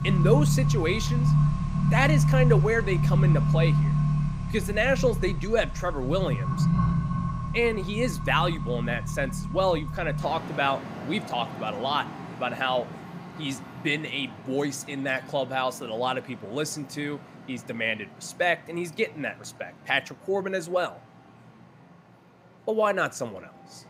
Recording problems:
traffic noise; very loud; throughout; 1 dB above the speech

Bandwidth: 15.5 kHz